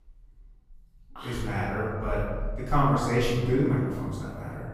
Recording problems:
room echo; strong; dies away in 1.3 s
off-mic speech; far

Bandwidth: 15 kHz